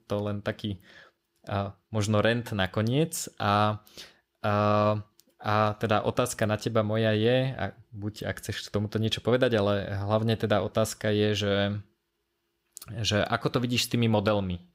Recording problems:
none

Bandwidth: 15.5 kHz